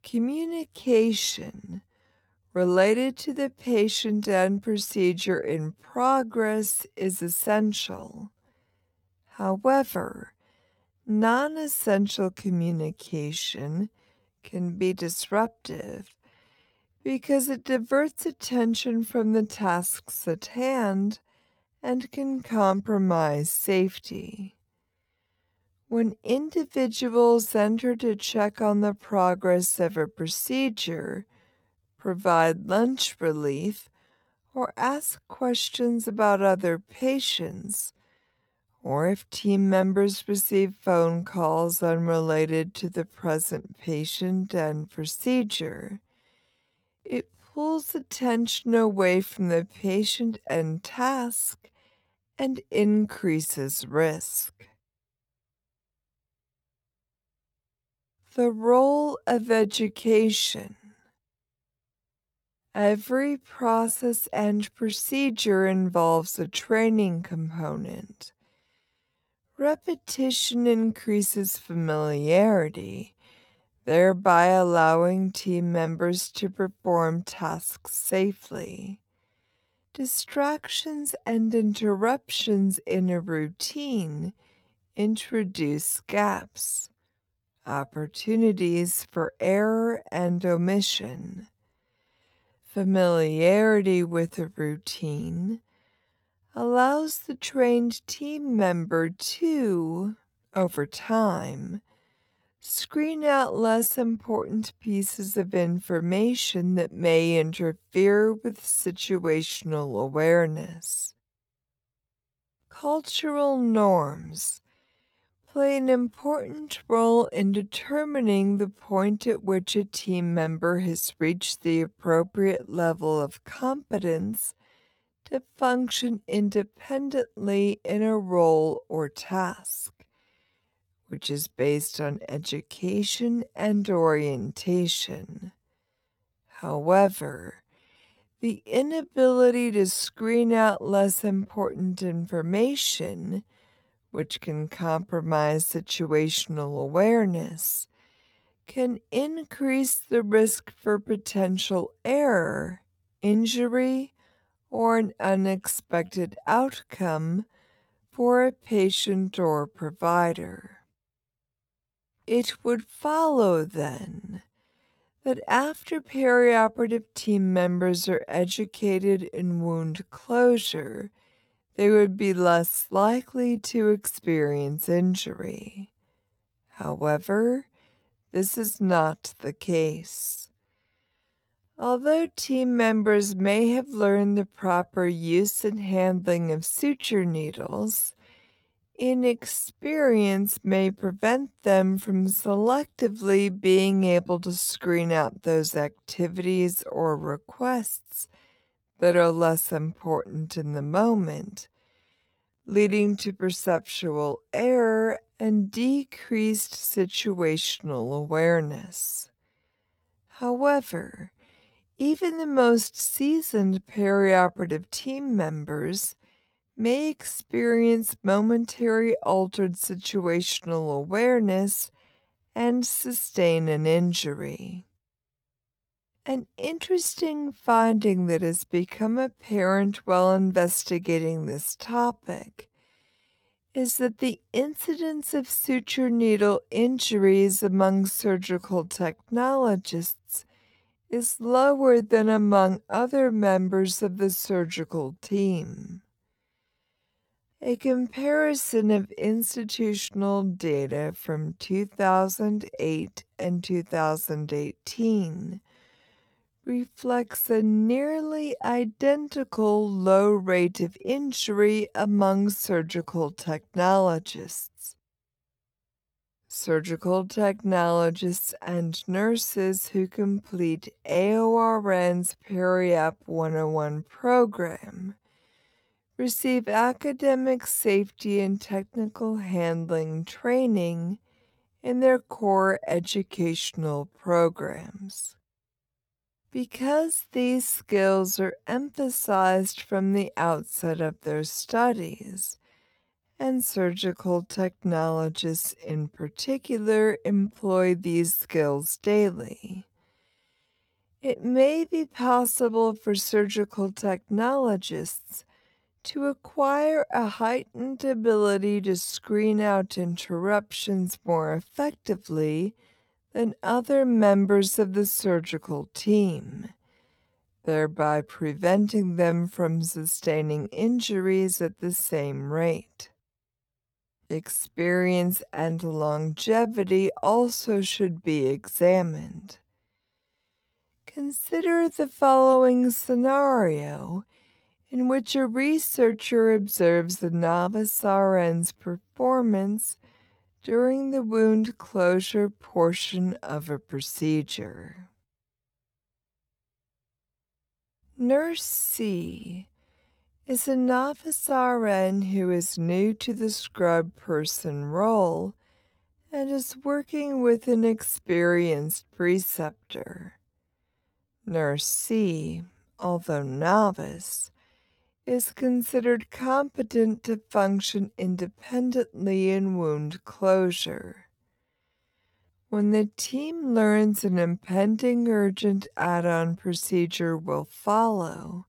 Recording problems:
wrong speed, natural pitch; too slow; 0.6 times normal speed

